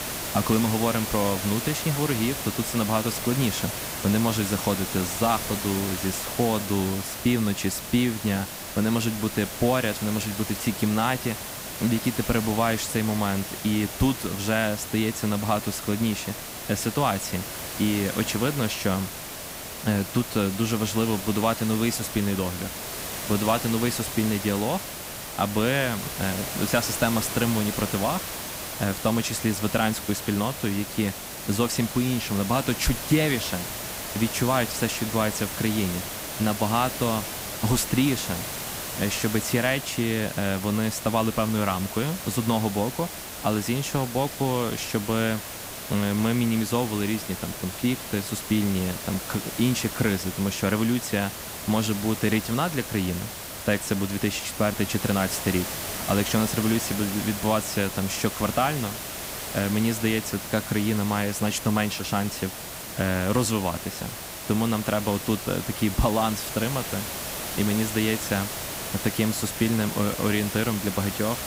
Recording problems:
hiss; loud; throughout; 6 dB below the speech

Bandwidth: 15.5 kHz